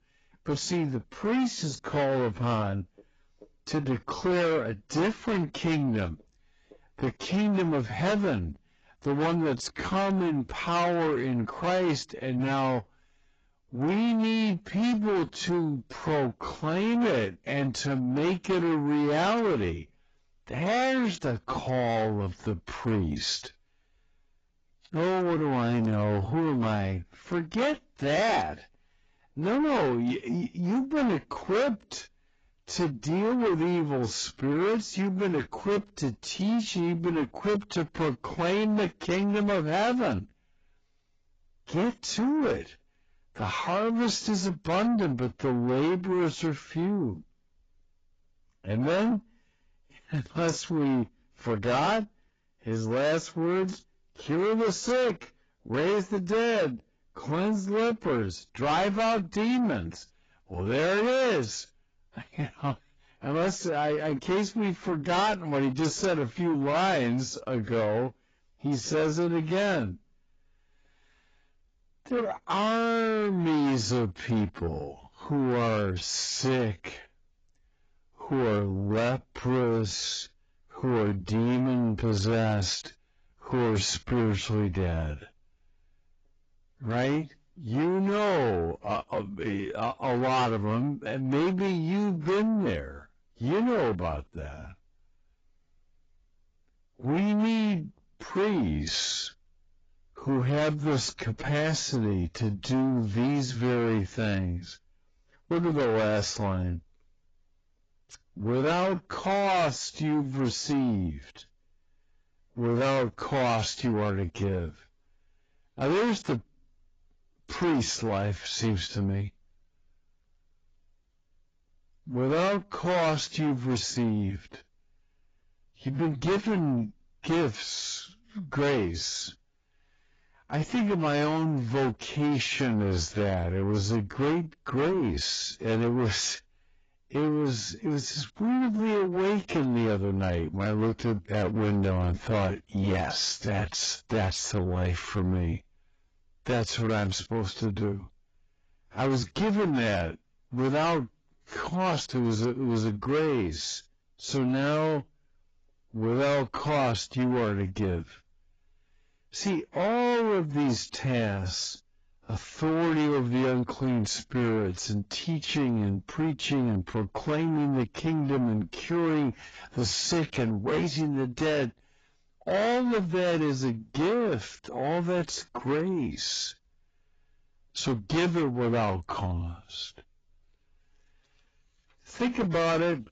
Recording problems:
distortion; heavy; 7 dB below the speech
garbled, watery; badly; nothing above 7.5 kHz
wrong speed, natural pitch; too slow; 0.6 times normal speed

